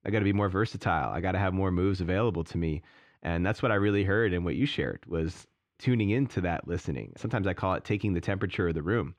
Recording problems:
muffled; slightly; fading above 4 kHz

